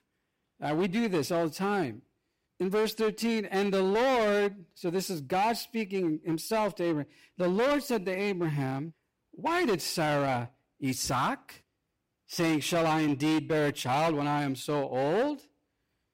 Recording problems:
distortion; heavy; 13% of the sound clipped

